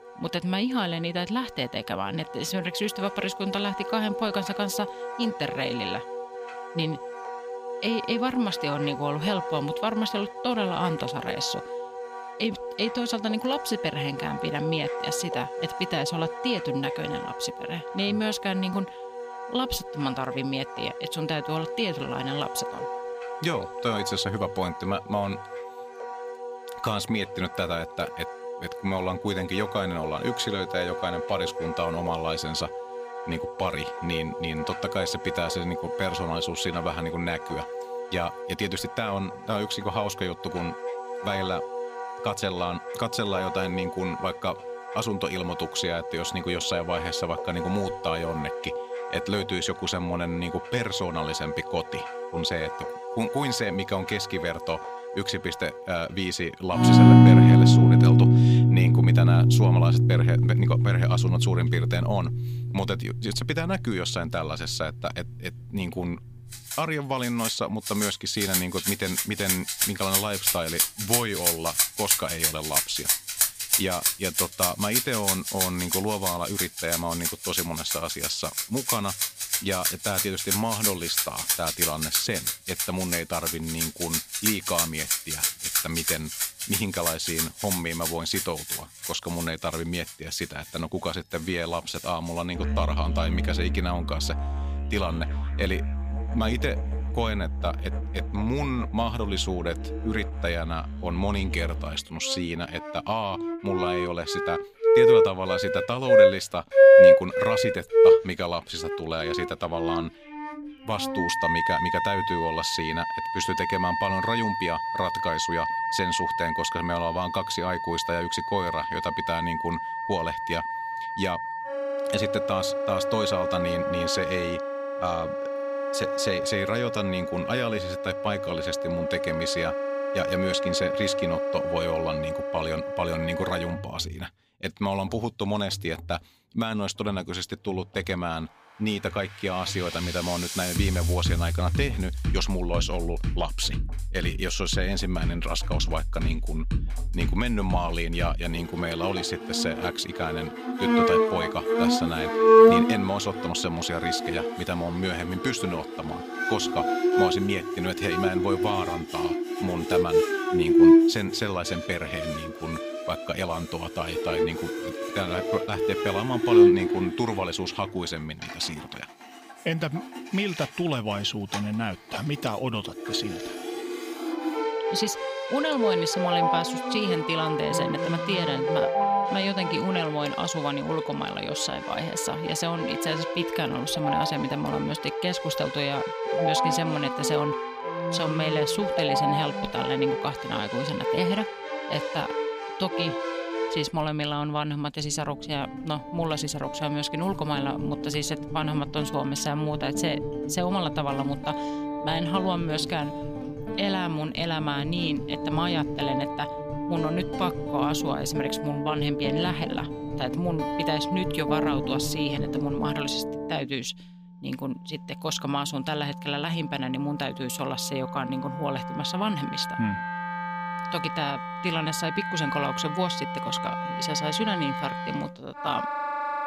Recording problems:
background music; very loud; throughout; 3 dB above the speech

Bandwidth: 15 kHz